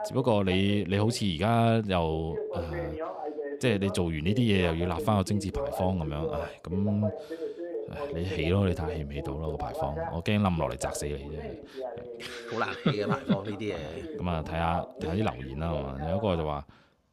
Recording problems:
voice in the background; loud; throughout; 8 dB below the speech

